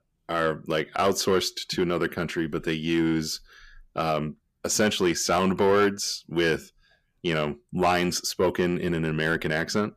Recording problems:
distortion; slight; 10 dB below the speech

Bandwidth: 14.5 kHz